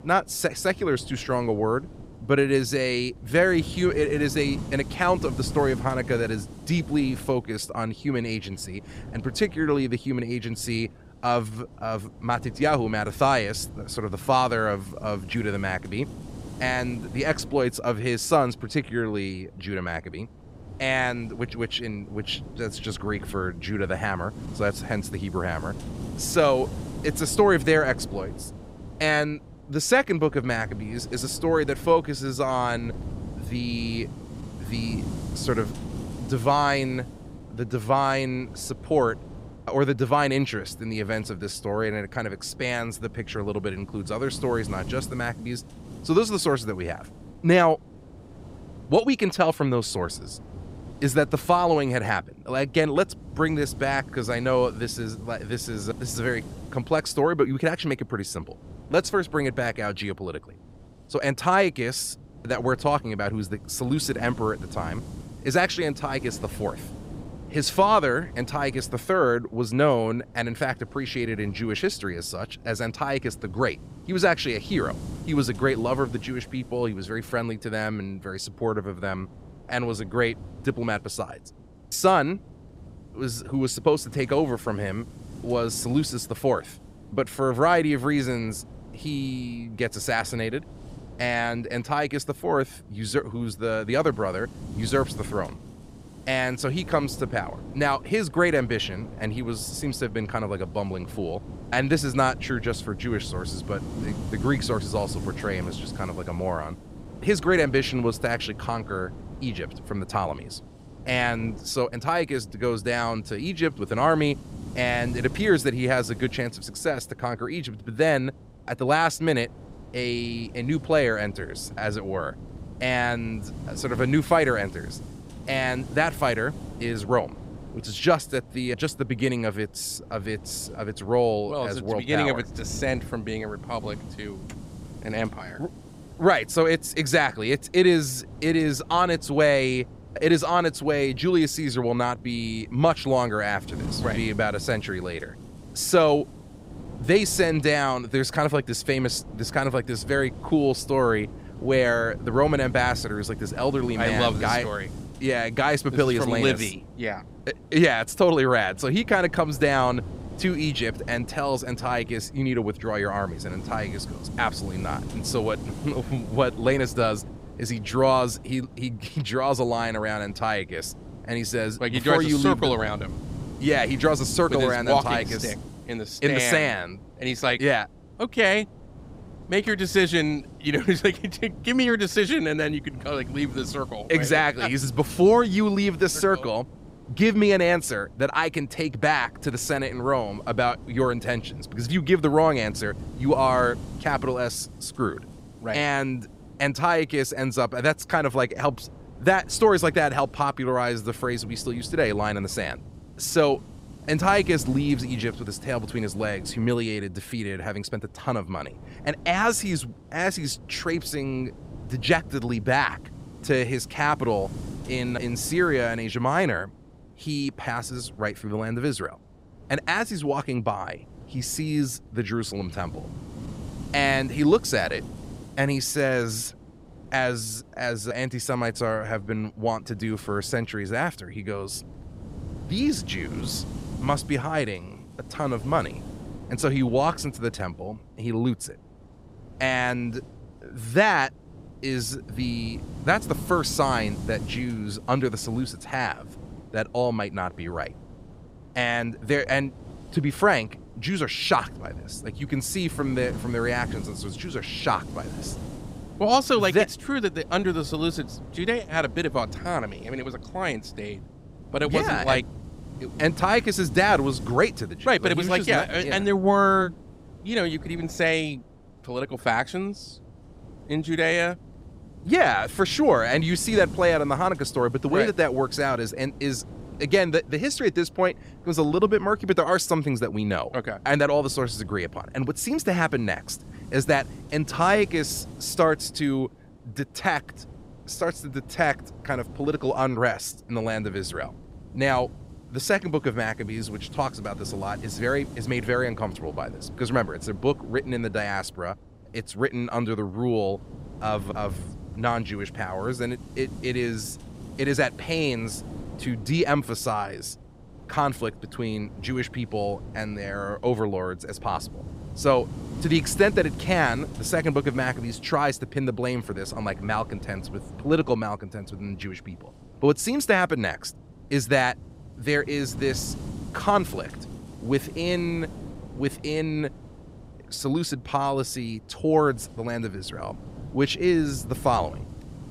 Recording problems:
wind noise on the microphone; occasional gusts; 20 dB below the speech

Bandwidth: 15.5 kHz